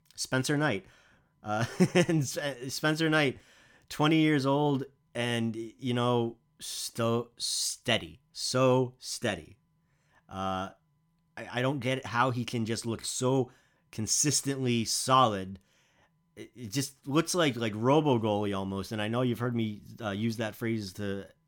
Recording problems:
none

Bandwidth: 18 kHz